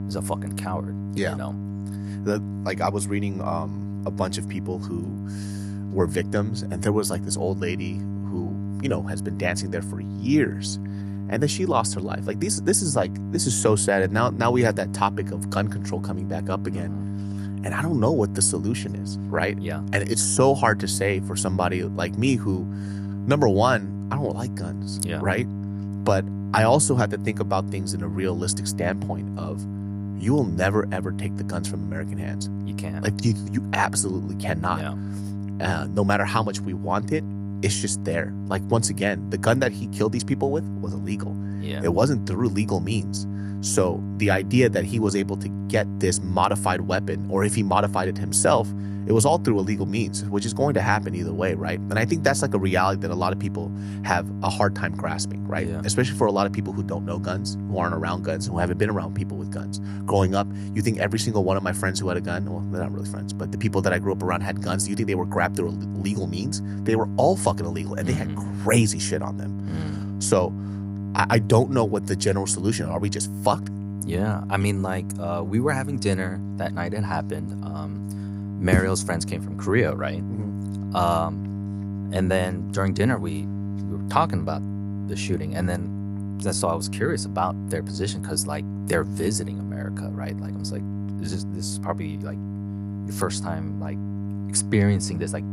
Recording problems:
electrical hum; noticeable; throughout; 50 Hz, 15 dB below the speech

